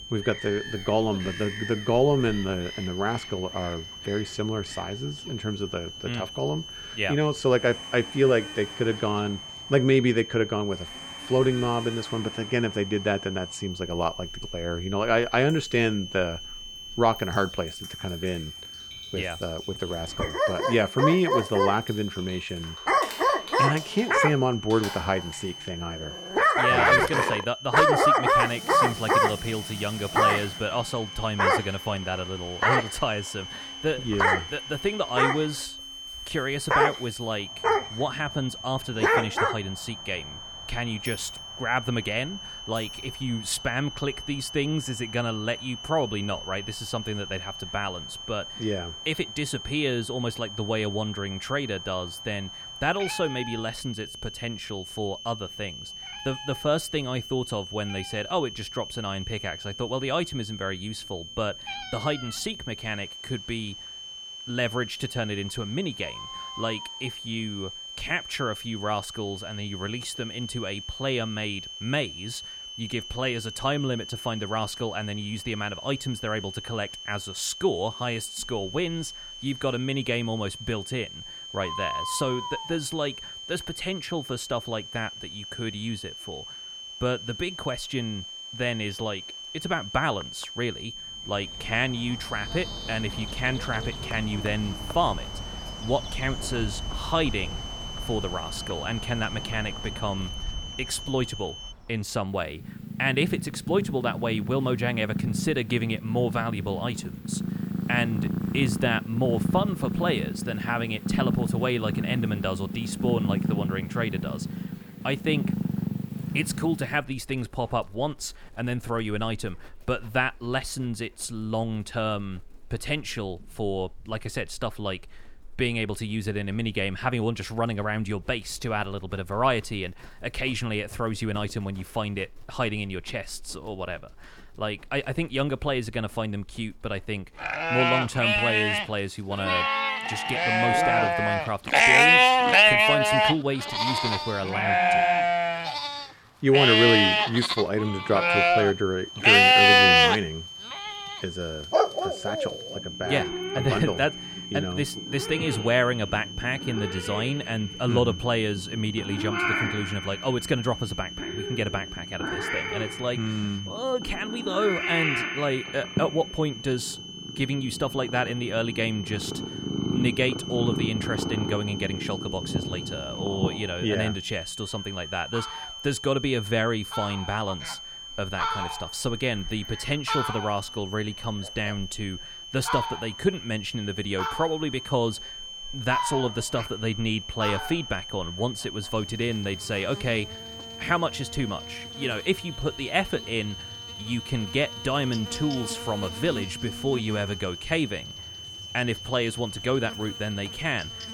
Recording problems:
animal sounds; very loud; throughout; 4 dB above the speech
high-pitched whine; loud; until 1:42 and from 2:29 on; 3 kHz, 9 dB below the speech
household noises; noticeable; until 43 s; 15 dB below the speech

